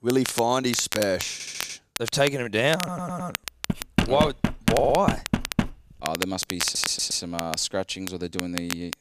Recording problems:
crackle, like an old record; loud; 8 dB below the speech
audio stuttering; 4 times, first at 1.5 s
door banging; loud; from 3.5 to 5.5 s; peak 1 dB above the speech

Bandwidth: 14.5 kHz